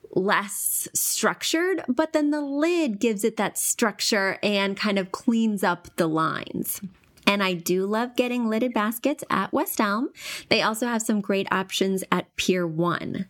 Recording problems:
squashed, flat; somewhat

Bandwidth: 17.5 kHz